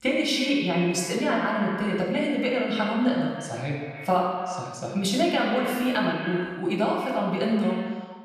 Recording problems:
echo of what is said; strong; throughout; 130 ms later, 9 dB below the speech
off-mic speech; far
room echo; noticeable; dies away in 0.8 s

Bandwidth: 14 kHz